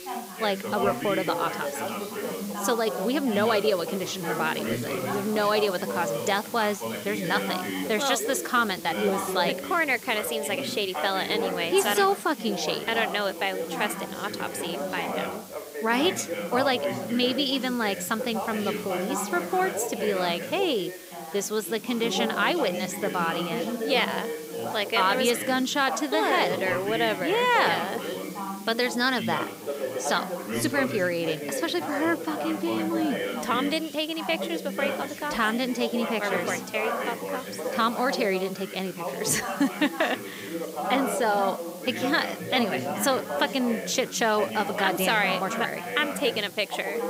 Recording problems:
background chatter; loud; throughout; 3 voices, 6 dB below the speech
hiss; noticeable; throughout; 15 dB below the speech

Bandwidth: 15.5 kHz